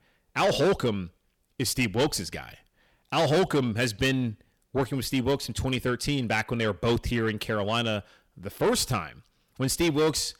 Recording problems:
distortion; heavy; 8 dB below the speech

